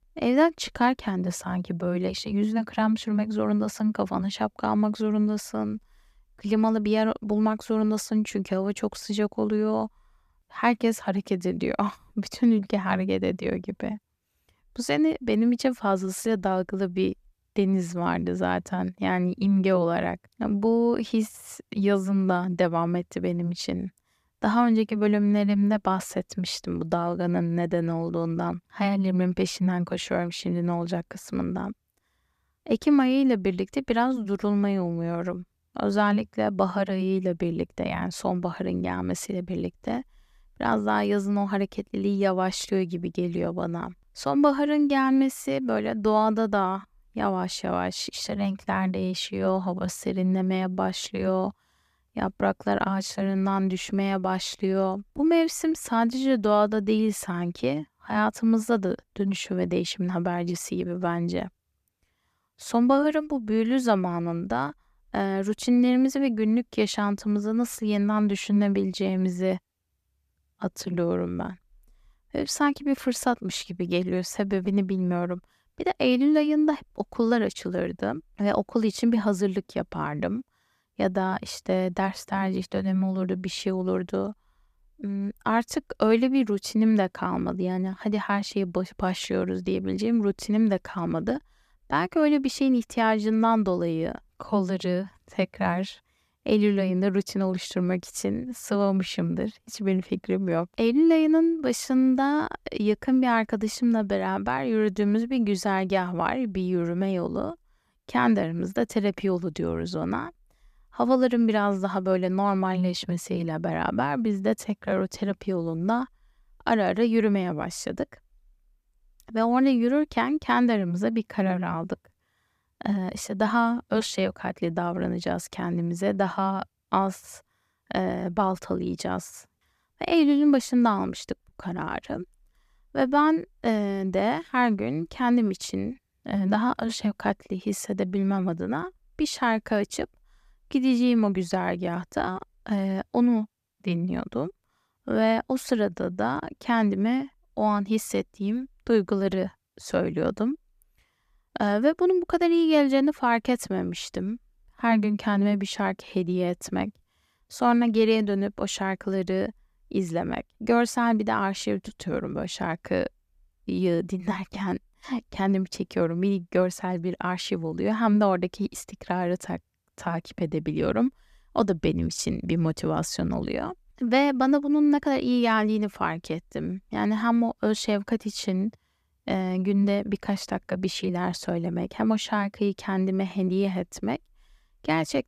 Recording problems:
none

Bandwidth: 14.5 kHz